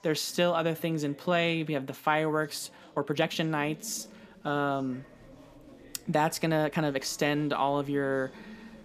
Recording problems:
chatter from many people; faint; throughout; 25 dB below the speech
uneven, jittery; strongly; from 3 to 8 s

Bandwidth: 14.5 kHz